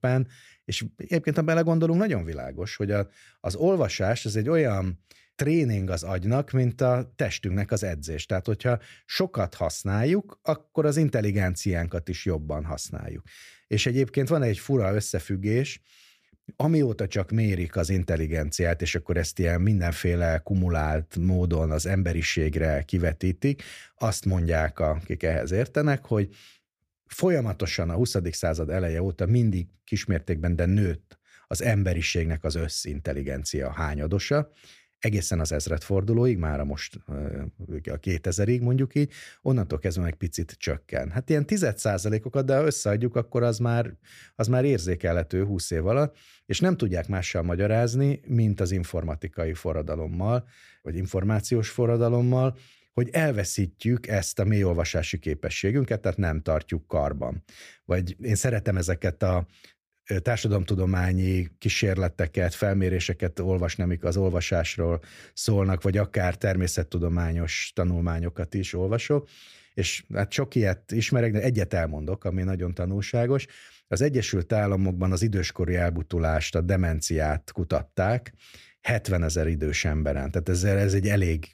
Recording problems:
none

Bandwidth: 15 kHz